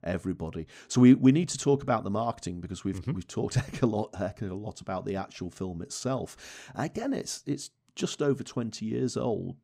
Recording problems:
none

